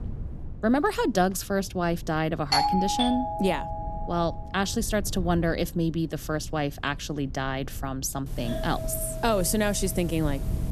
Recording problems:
low rumble; faint; throughout; 25 dB below the speech
doorbell; loud; from 2.5 to 4 s; peak 4 dB above the speech
doorbell; noticeable; from 8.5 s on; peak 6 dB below the speech

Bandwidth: 13.5 kHz